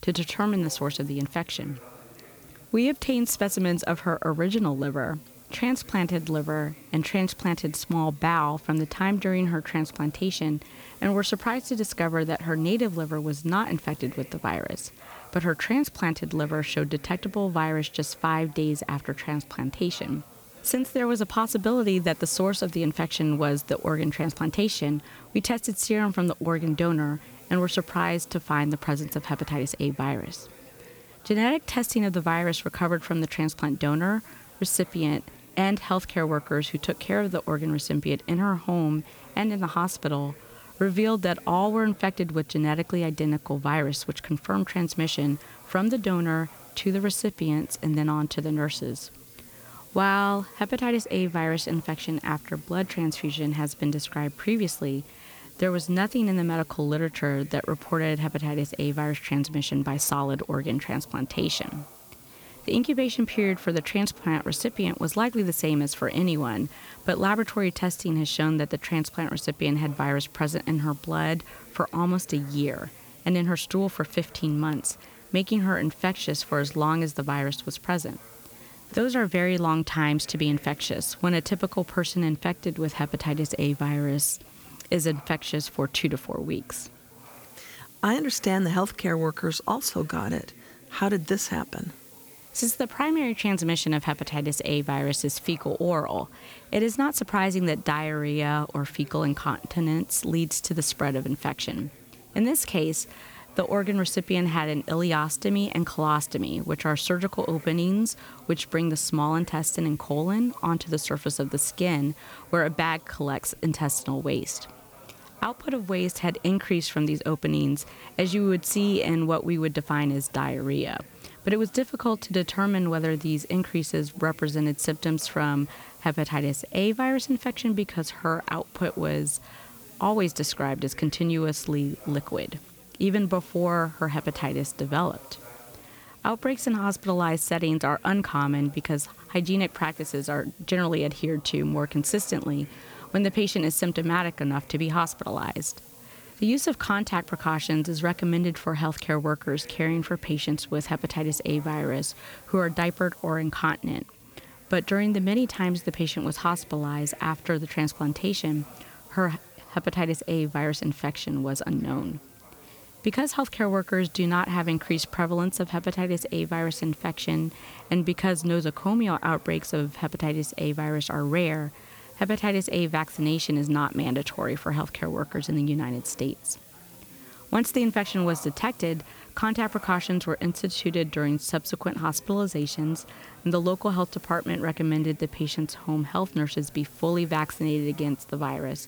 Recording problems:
chatter from many people; faint; throughout; 25 dB below the speech
hiss; faint; throughout; 20 dB below the speech

